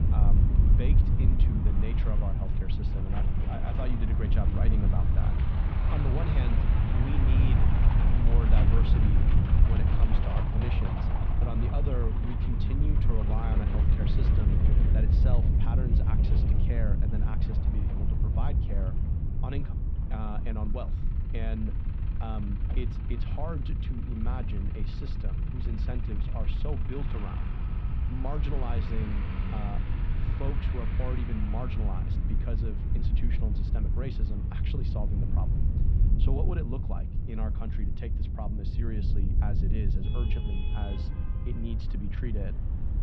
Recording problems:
muffled; slightly; fading above 3.5 kHz
wind noise on the microphone; heavy; 1 dB below the speech
traffic noise; loud; throughout; 6 dB below the speech

